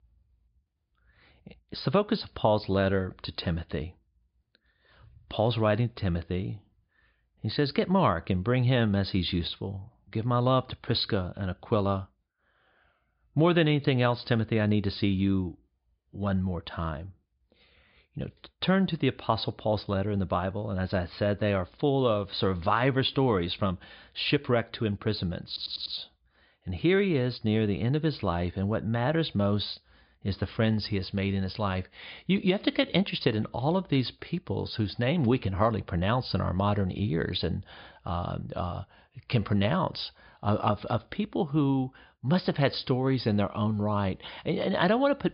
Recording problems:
high frequencies cut off; severe; nothing above 5 kHz
audio stuttering; at 25 s

